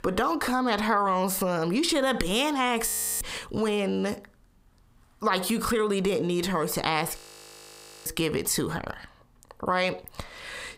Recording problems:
squashed, flat; heavily
audio freezing; at 3 s and at 7 s for 1 s

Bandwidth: 15.5 kHz